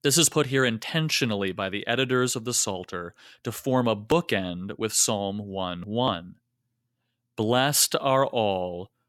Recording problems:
none

